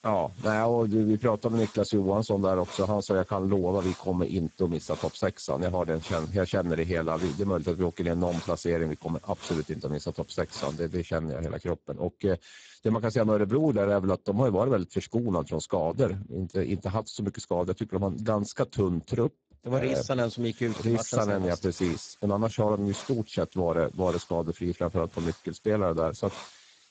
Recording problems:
garbled, watery; badly; nothing above 7.5 kHz
hiss; noticeable; until 11 s and from 20 s on; 20 dB below the speech

